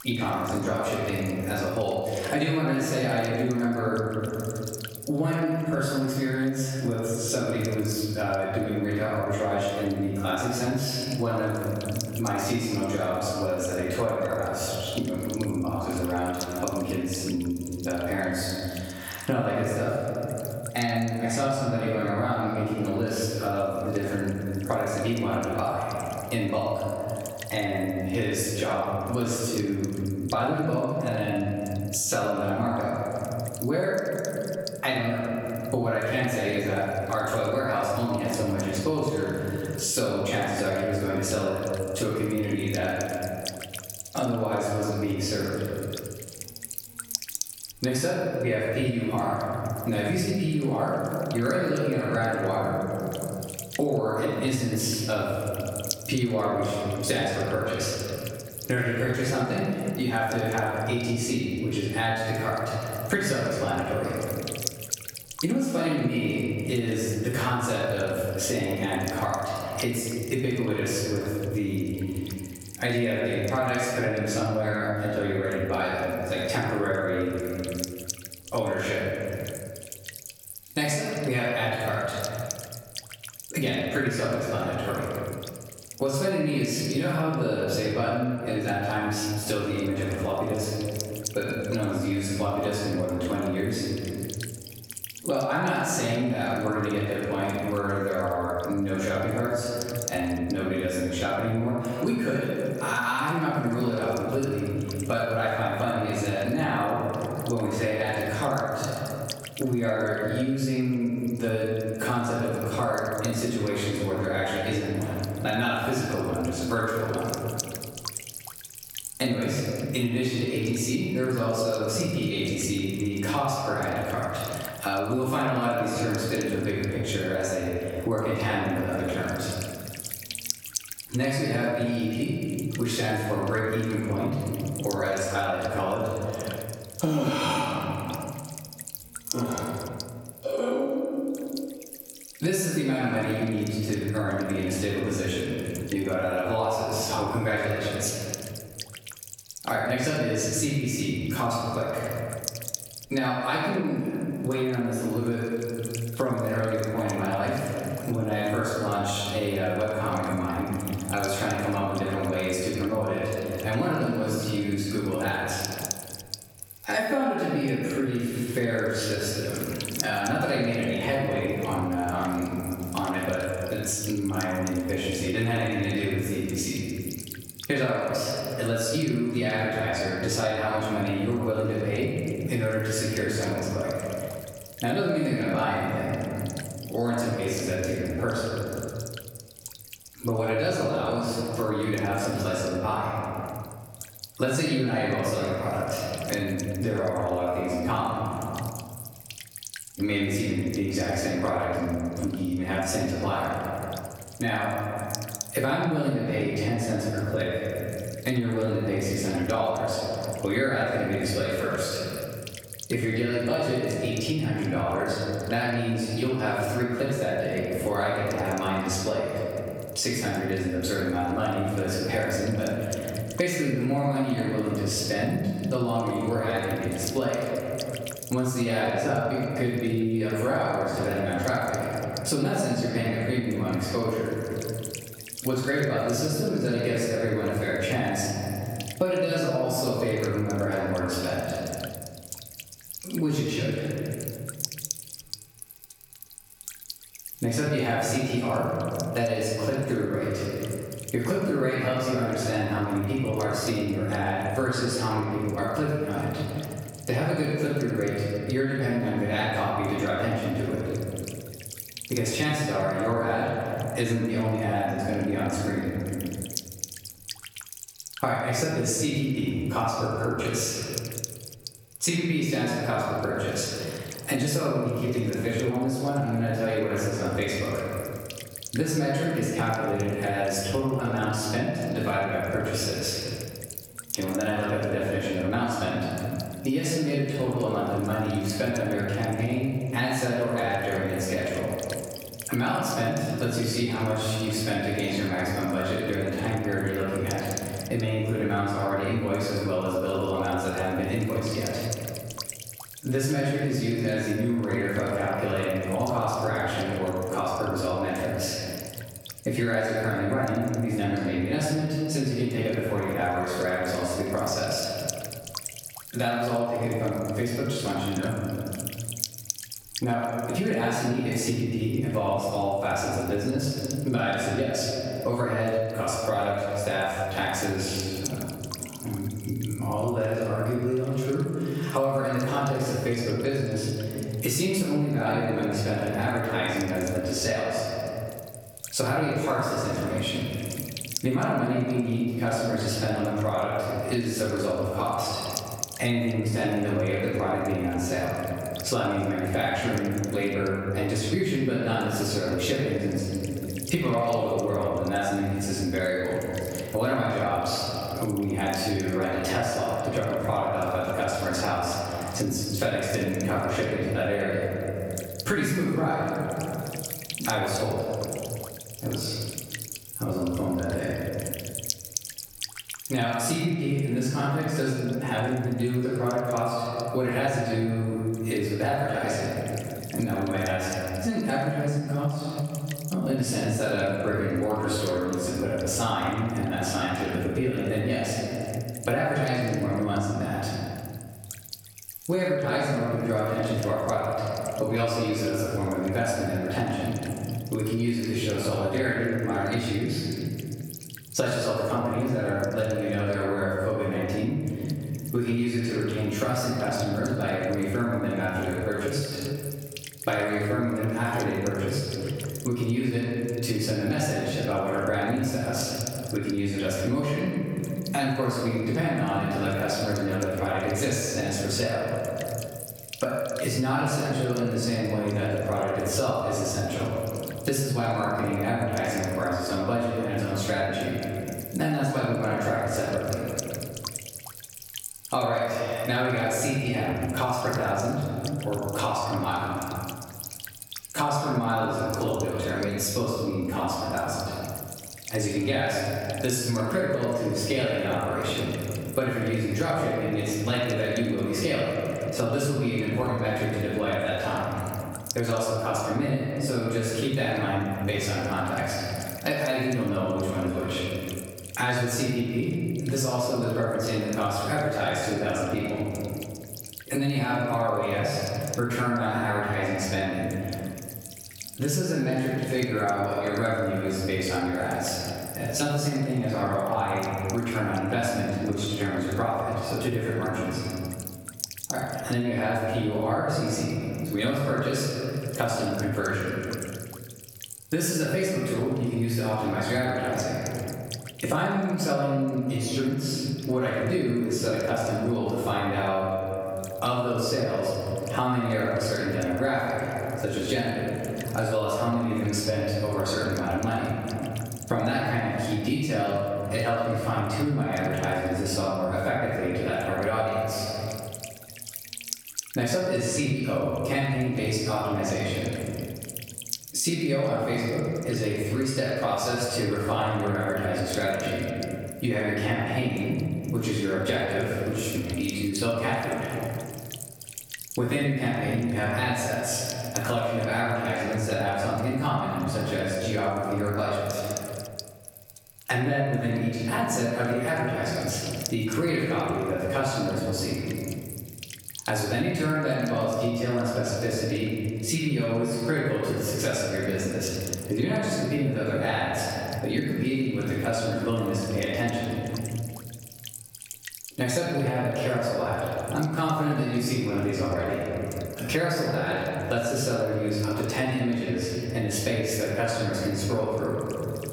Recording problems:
room echo; strong; dies away in 1.4 s
off-mic speech; far
squashed, flat; somewhat
electrical hum; noticeable; throughout; 60 Hz, 15 dB below the speech

